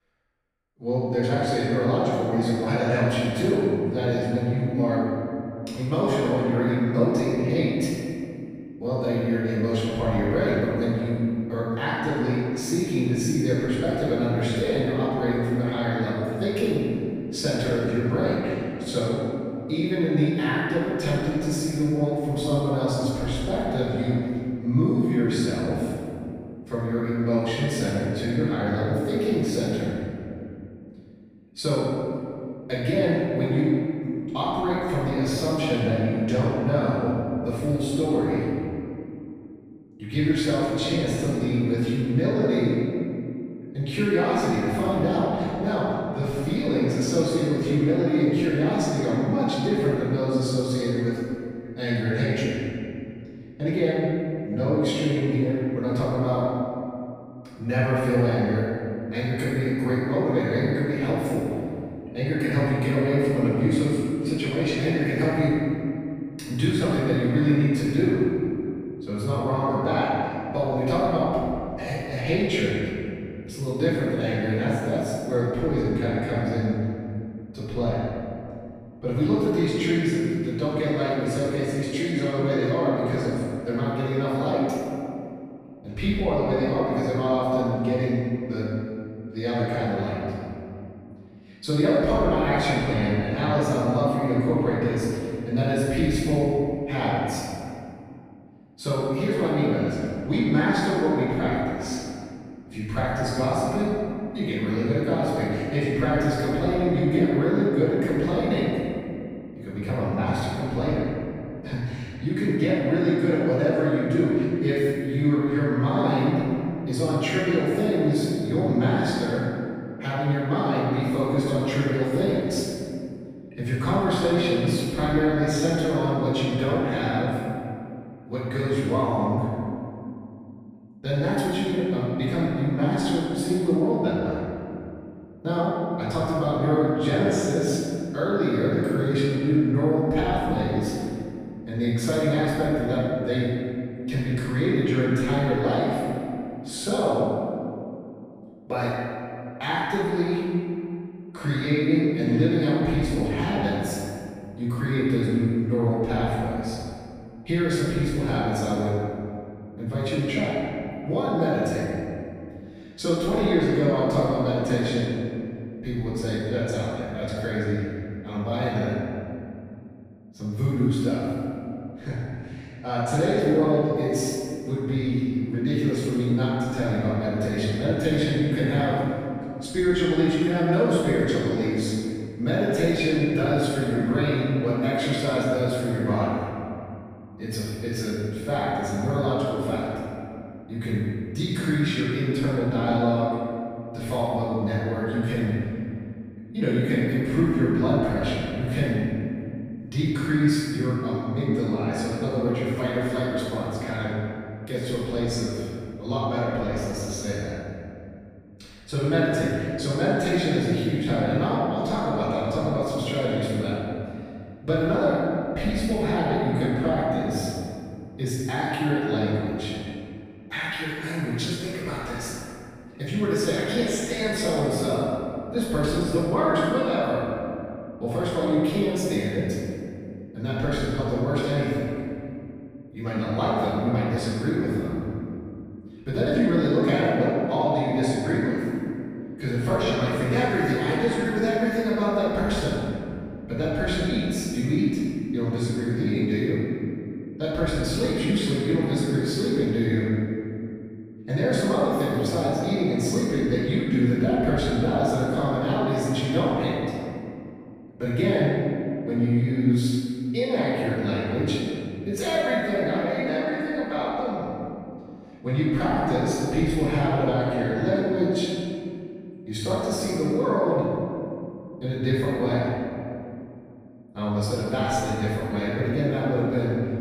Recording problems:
room echo; strong; dies away in 2.4 s
off-mic speech; far

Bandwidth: 15 kHz